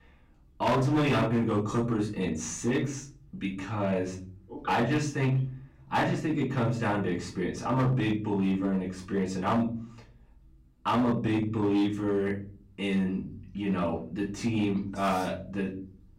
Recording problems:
off-mic speech; far
room echo; slight; dies away in 0.6 s
distortion; slight; 6% of the sound clipped

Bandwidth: 16 kHz